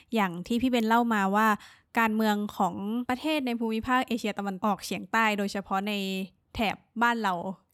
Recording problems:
none

